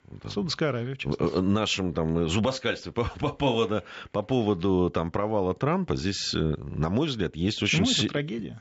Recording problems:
high frequencies cut off; noticeable; nothing above 8 kHz

